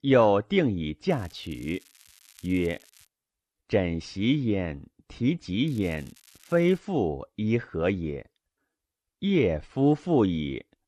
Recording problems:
crackling; faint; from 1 to 3 s and from 5.5 to 7 s; 25 dB below the speech

